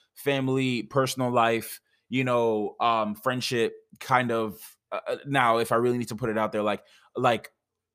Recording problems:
none

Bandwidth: 15 kHz